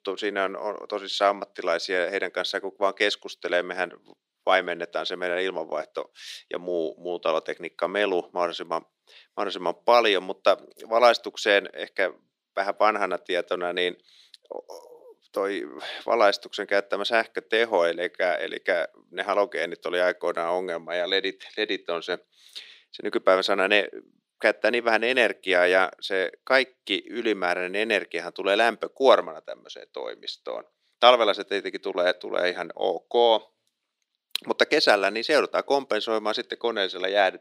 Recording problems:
thin; somewhat; fading below 300 Hz

